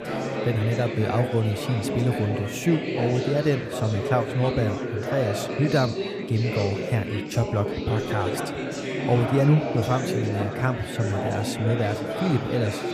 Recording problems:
chatter from many people; loud; throughout; 3 dB below the speech

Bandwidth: 15 kHz